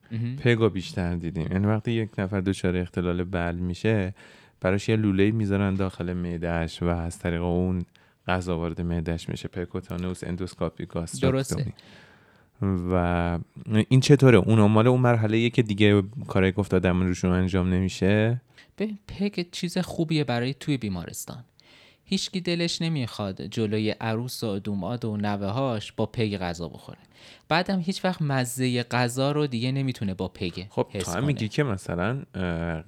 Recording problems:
none

